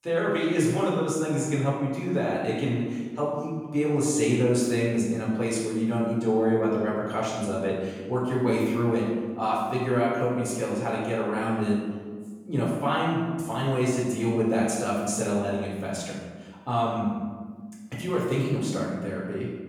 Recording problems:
off-mic speech; far
room echo; noticeable; dies away in 1.3 s

